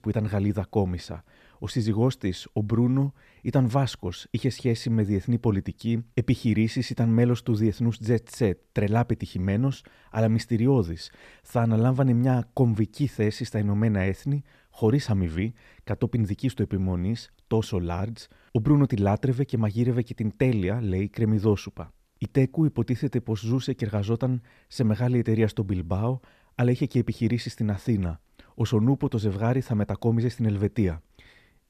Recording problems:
none

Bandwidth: 14.5 kHz